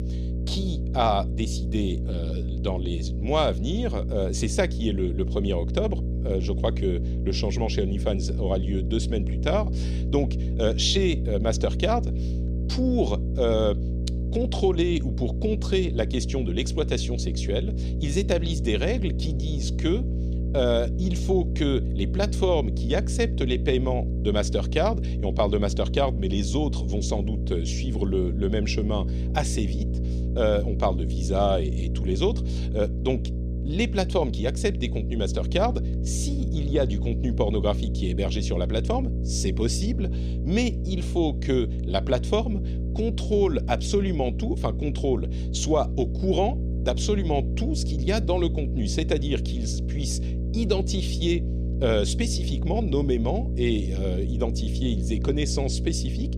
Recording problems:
electrical hum; noticeable; throughout; 60 Hz, 10 dB below the speech

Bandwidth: 13.5 kHz